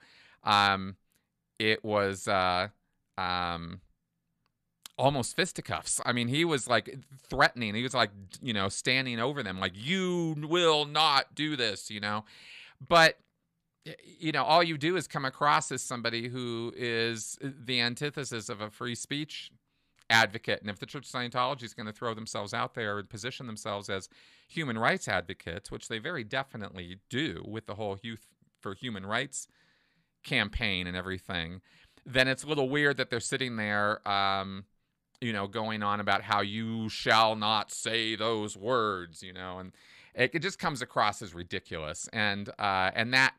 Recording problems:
none

